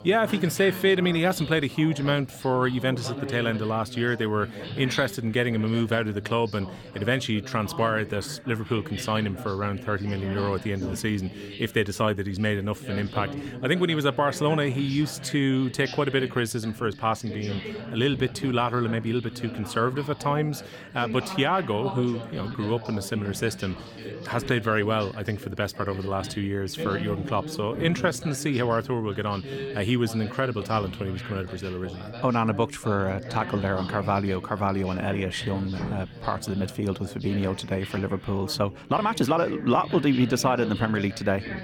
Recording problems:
background chatter; noticeable; throughout; 3 voices, 10 dB below the speech
uneven, jittery; strongly; from 22 to 39 s

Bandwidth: 18.5 kHz